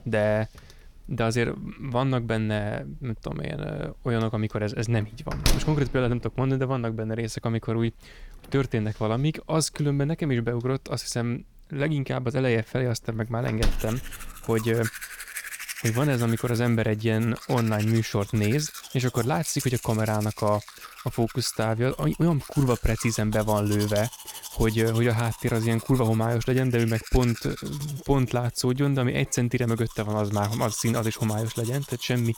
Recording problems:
household noises; noticeable; throughout; 10 dB below the speech

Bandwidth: 18.5 kHz